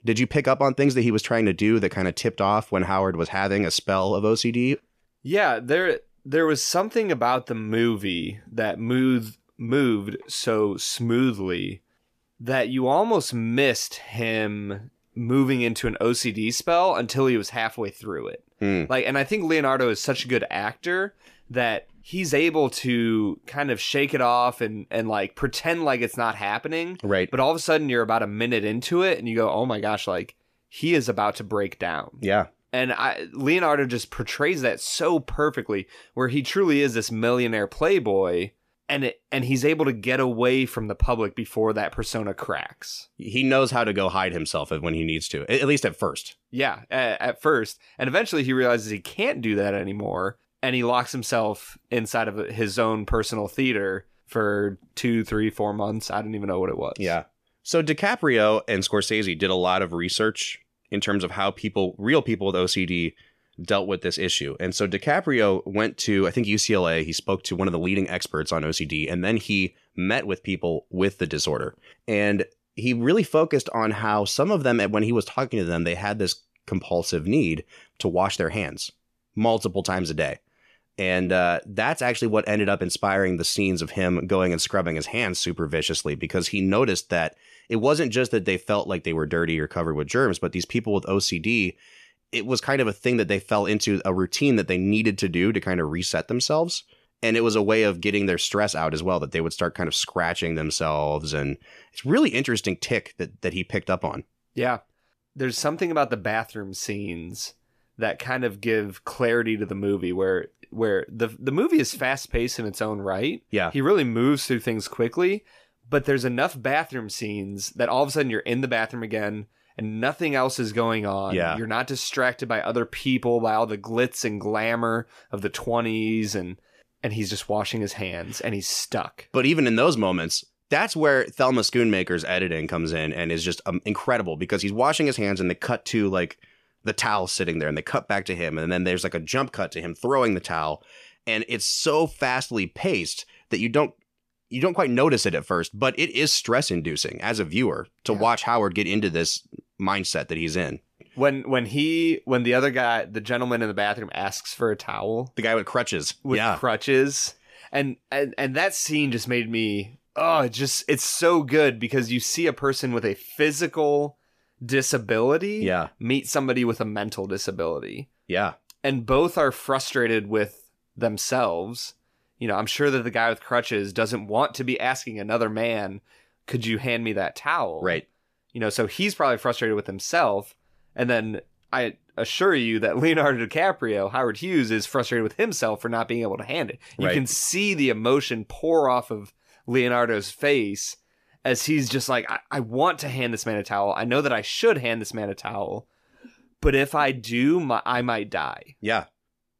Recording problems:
none

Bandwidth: 14.5 kHz